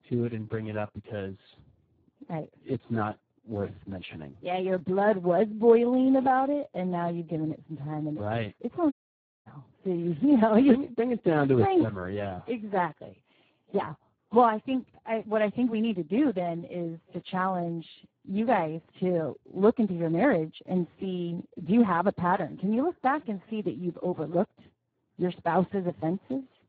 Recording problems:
garbled, watery; badly
audio cutting out; at 9 s for 0.5 s

